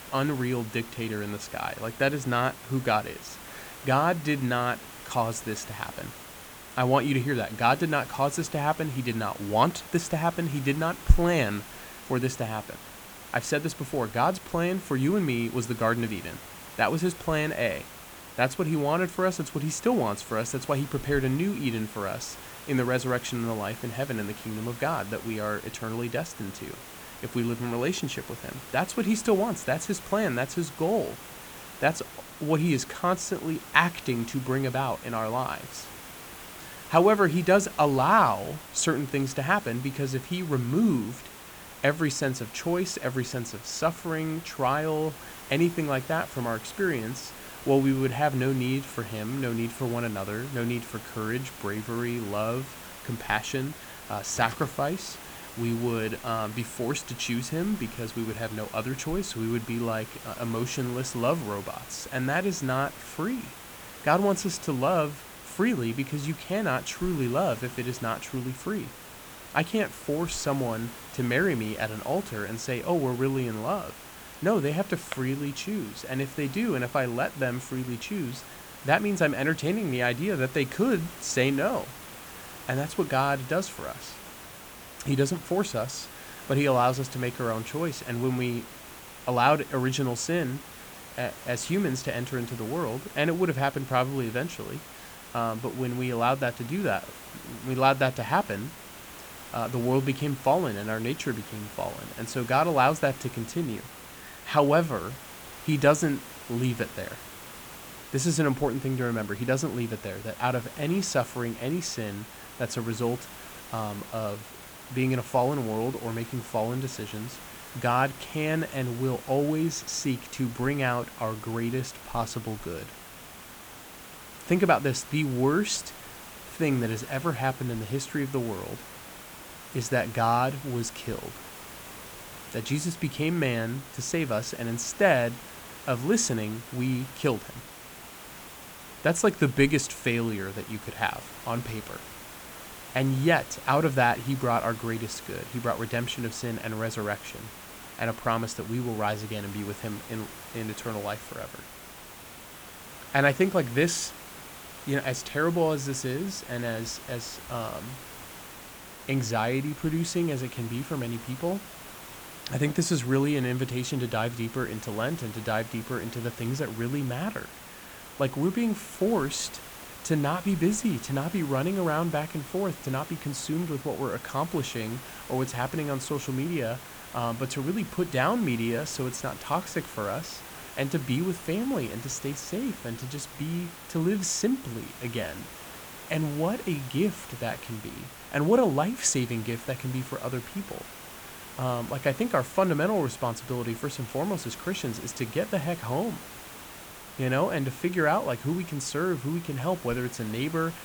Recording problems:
hiss; noticeable; throughout; 15 dB below the speech

